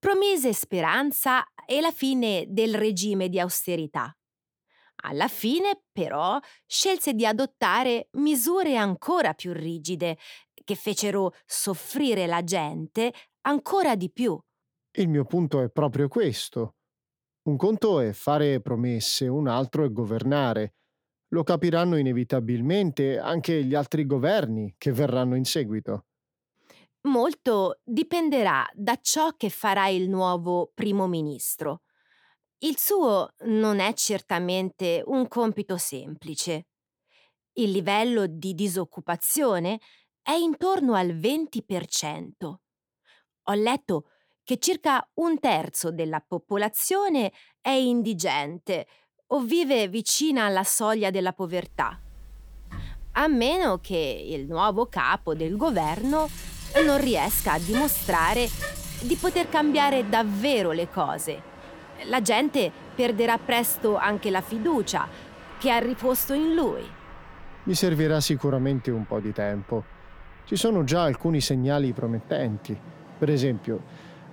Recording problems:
traffic noise; noticeable; from 52 s on; 15 dB below the speech

